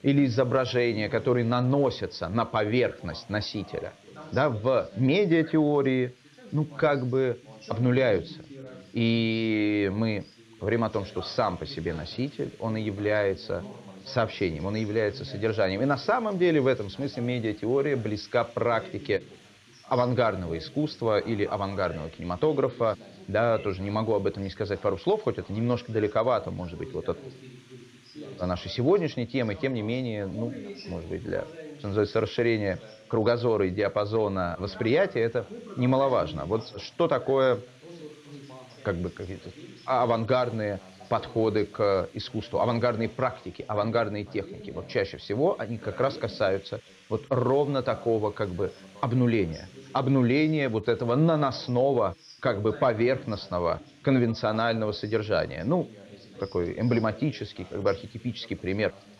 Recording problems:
high frequencies cut off; noticeable; nothing above 6 kHz
background chatter; noticeable; throughout; 2 voices, 20 dB below the speech
hiss; faint; throughout; 30 dB below the speech

